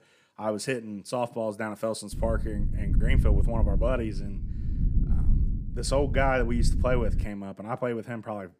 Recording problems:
low rumble; noticeable; from 2 to 7 s; 15 dB below the speech

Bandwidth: 15 kHz